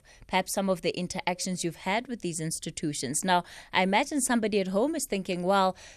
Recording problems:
none

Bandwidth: 13.5 kHz